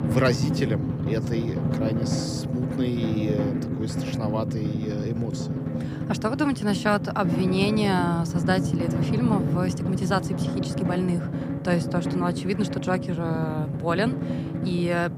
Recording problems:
background music; loud; throughout; as loud as the speech

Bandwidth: 15.5 kHz